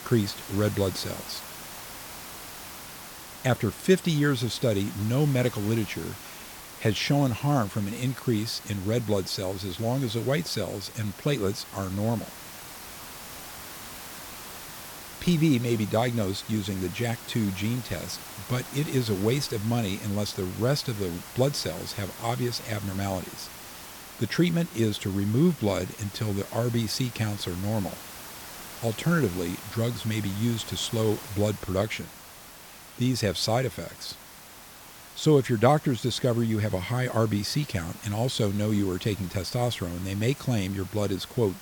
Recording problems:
hiss; noticeable; throughout; 15 dB below the speech

